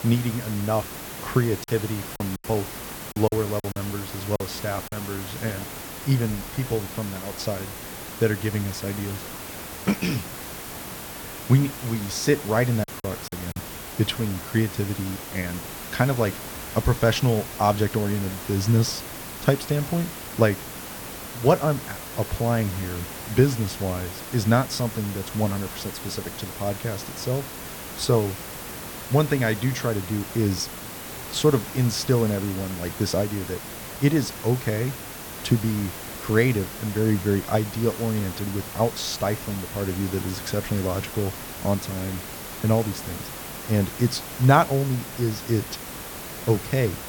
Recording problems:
hiss; loud; throughout; 9 dB below the speech
choppy; very; from 1.5 to 5 s and at 13 s; 12% of the speech affected

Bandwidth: 18 kHz